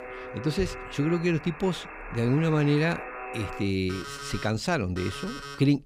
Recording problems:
alarms or sirens; noticeable; throughout; 10 dB below the speech

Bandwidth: 15.5 kHz